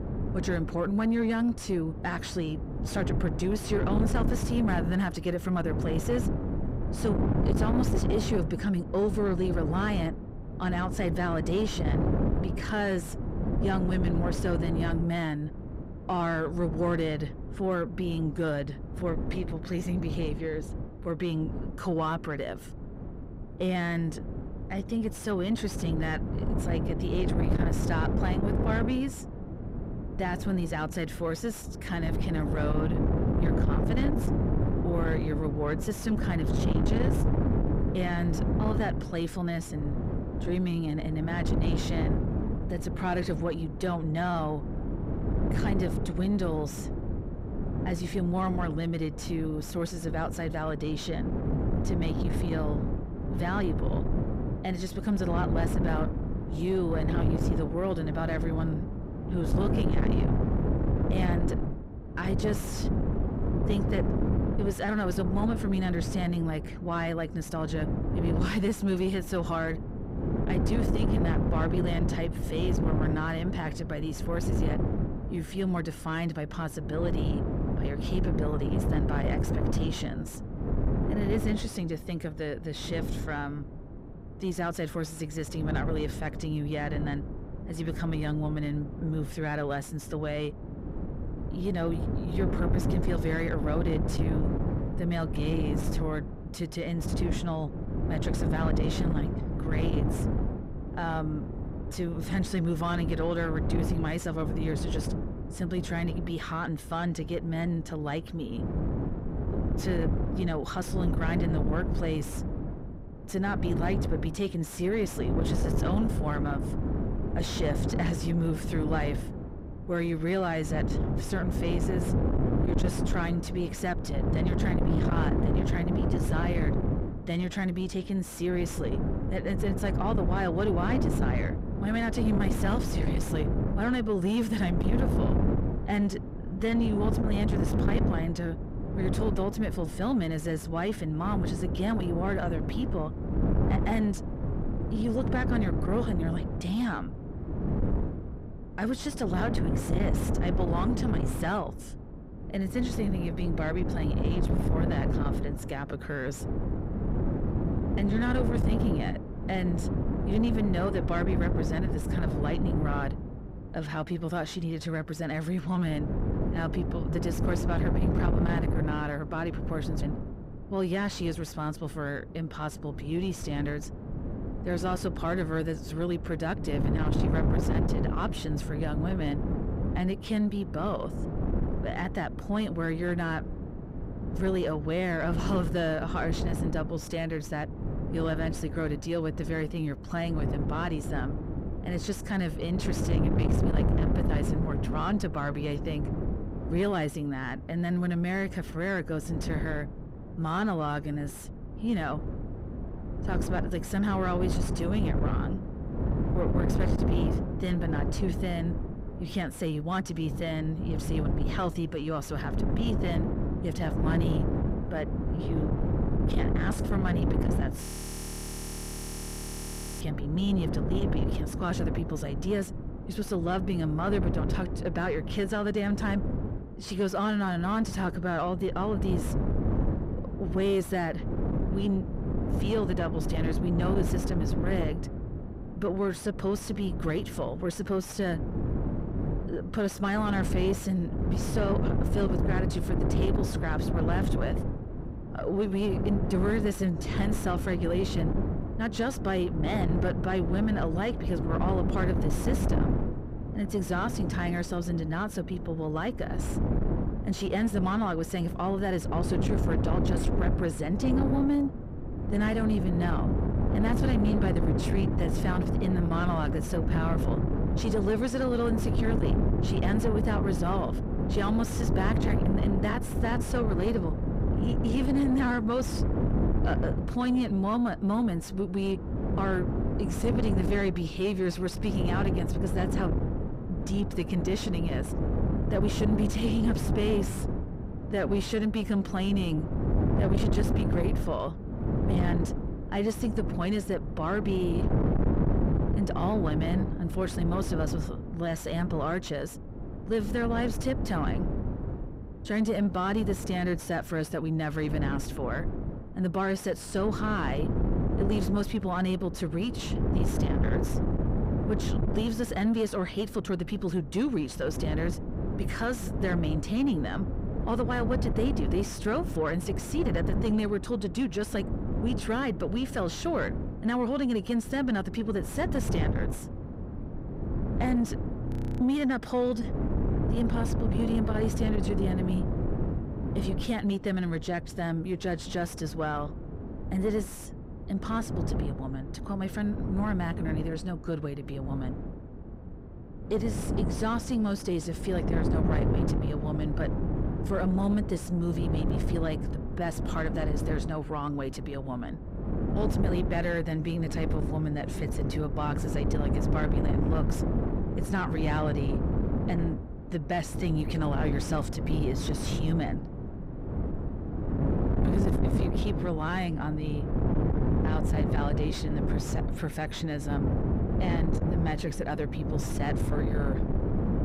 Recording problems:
distortion; slight; 10 dB below the speech
wind noise on the microphone; heavy; 4 dB below the speech
audio freezing; at 3:38 for 2 s and at 5:28

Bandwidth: 15.5 kHz